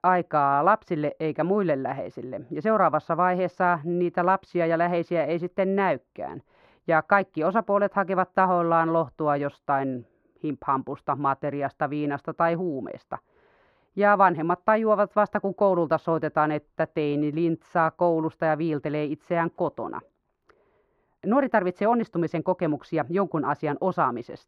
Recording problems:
muffled; very; fading above 3 kHz

